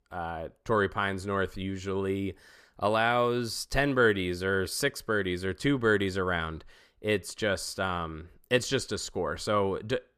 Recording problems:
none

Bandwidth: 14.5 kHz